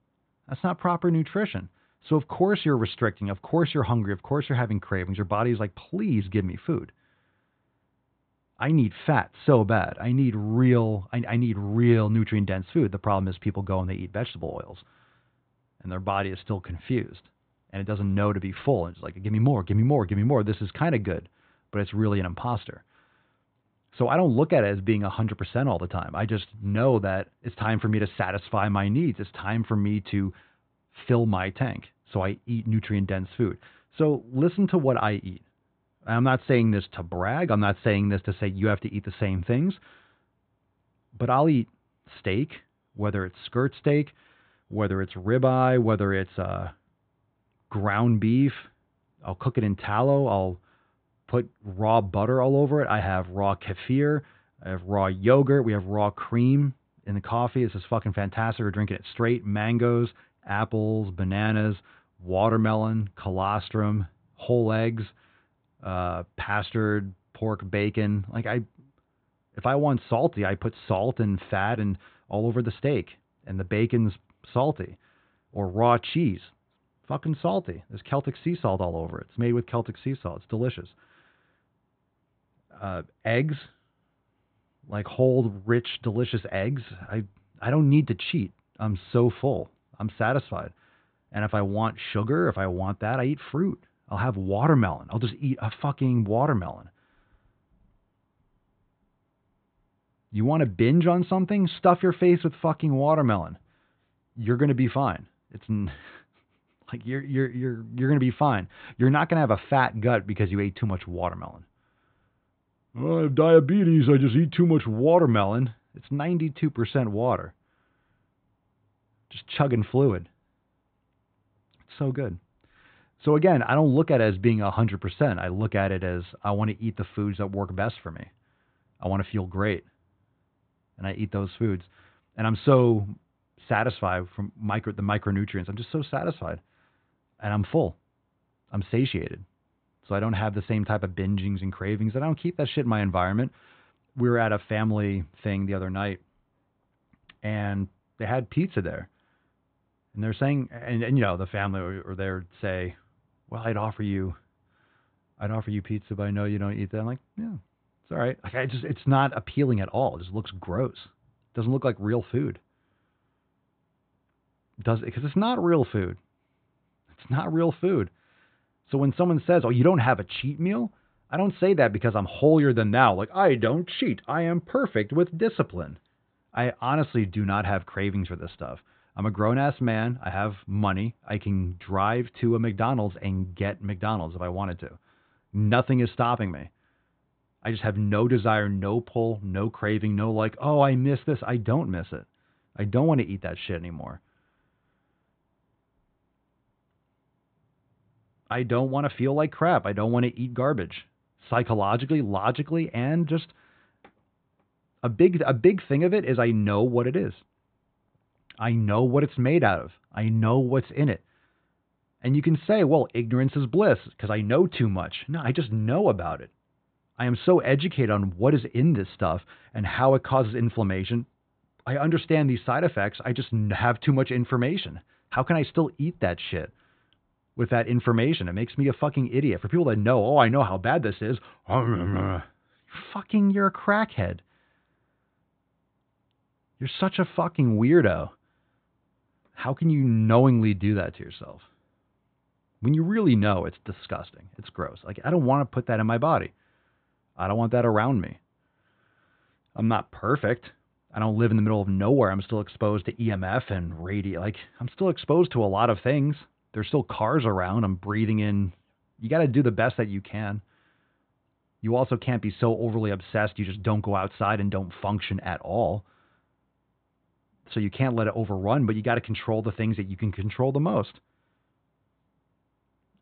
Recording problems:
high frequencies cut off; severe; nothing above 4 kHz

